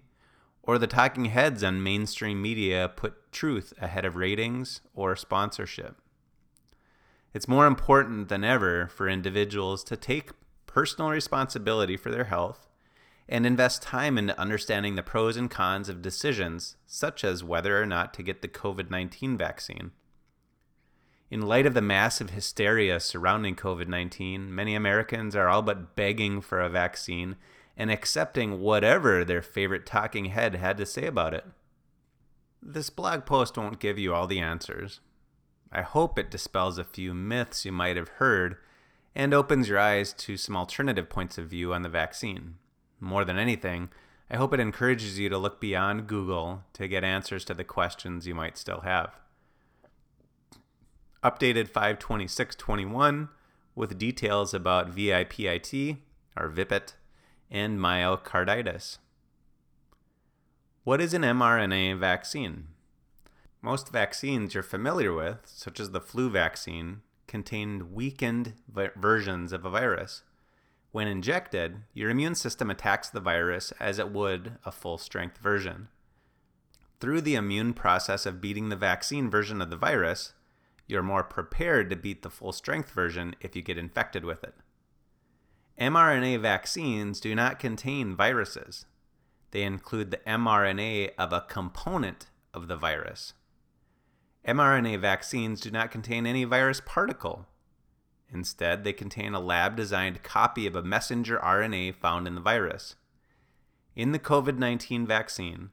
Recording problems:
none

